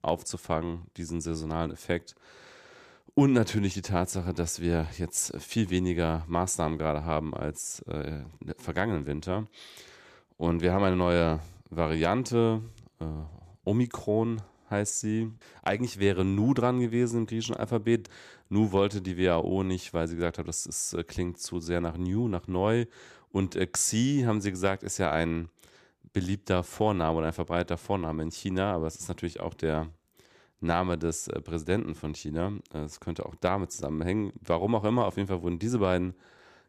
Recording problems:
none

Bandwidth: 14.5 kHz